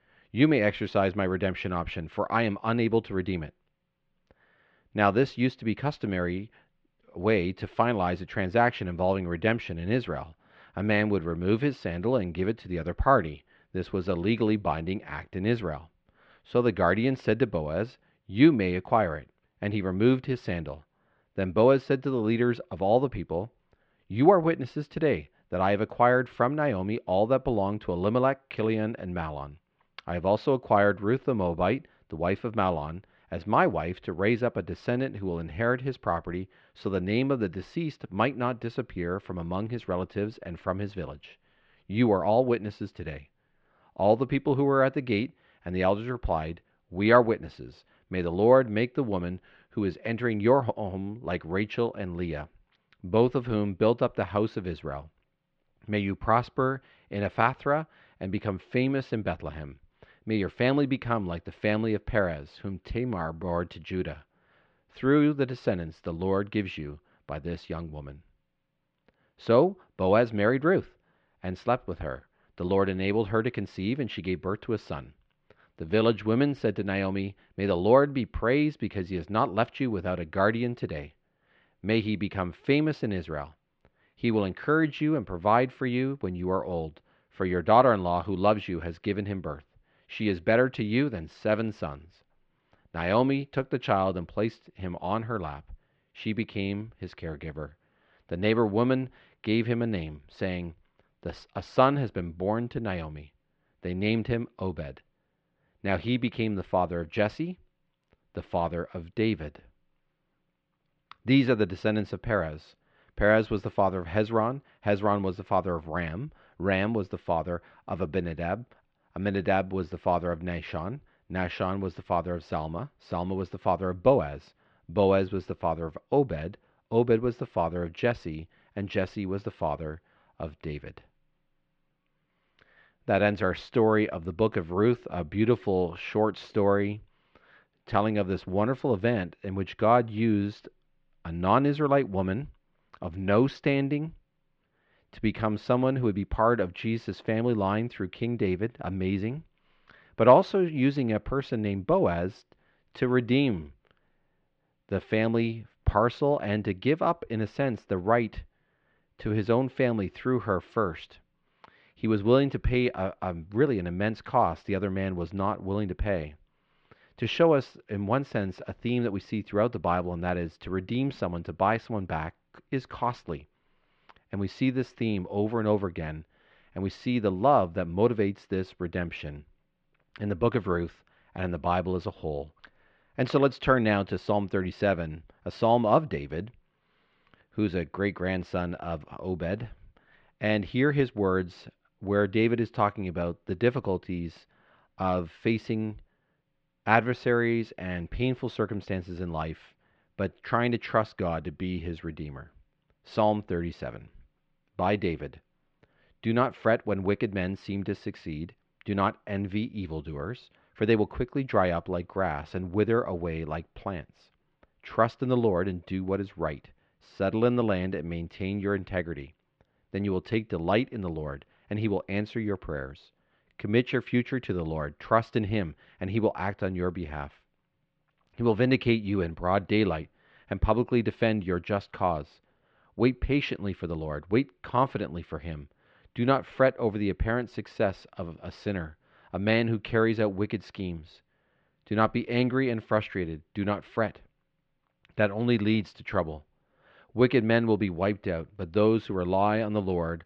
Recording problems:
muffled; very; fading above 3 kHz

